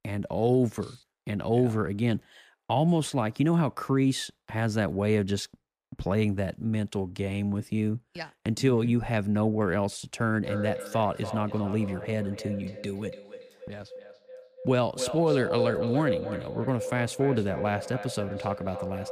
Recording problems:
echo of what is said; strong; from 10 s on; 290 ms later, 8 dB below the speech

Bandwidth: 15 kHz